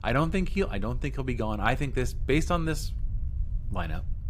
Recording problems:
low rumble; faint; throughout; 25 dB below the speech

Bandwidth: 15.5 kHz